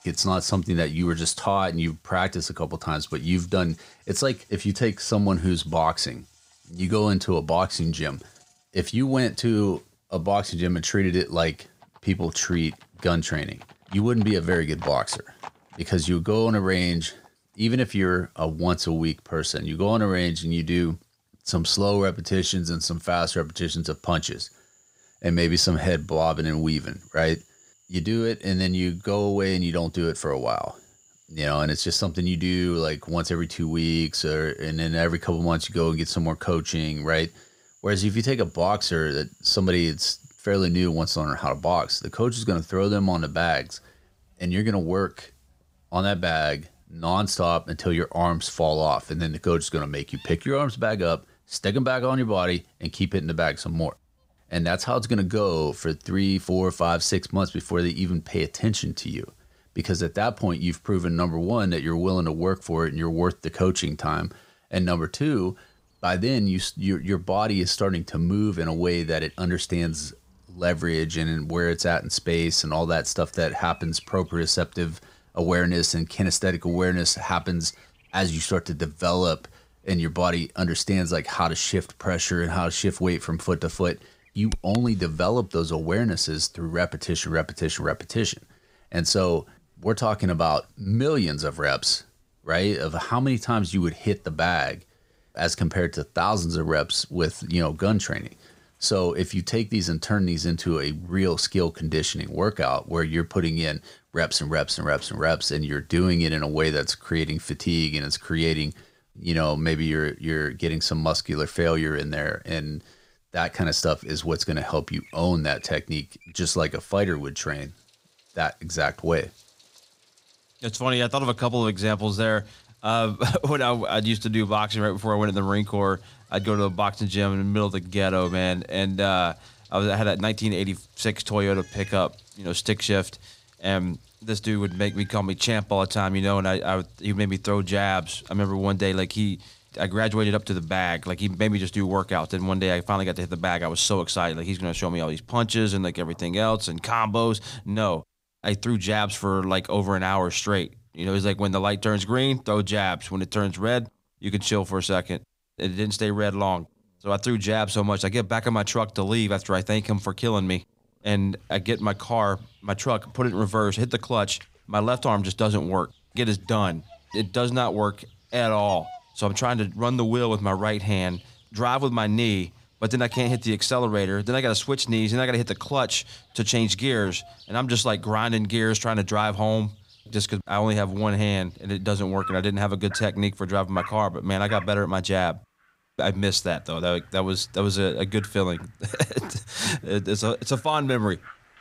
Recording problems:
animal sounds; faint; throughout; 25 dB below the speech

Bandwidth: 15.5 kHz